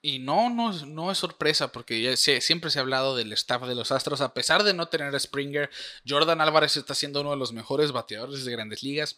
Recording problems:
thin; very slightly; fading below 950 Hz

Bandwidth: 15 kHz